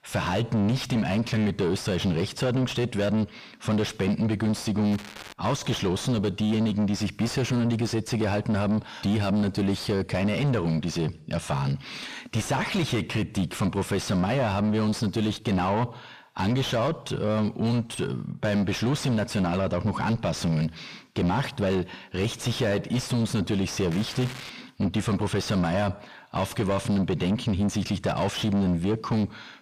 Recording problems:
distortion; heavy; 7 dB below the speech
crackling; noticeable; at 5 s and at 24 s; 15 dB below the speech

